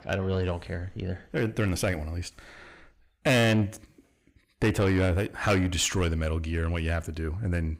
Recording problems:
distortion; heavy; 7 dB below the speech

